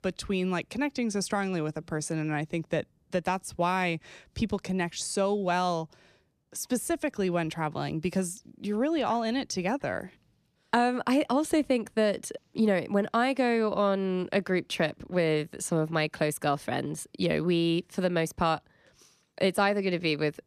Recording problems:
none

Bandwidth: 14 kHz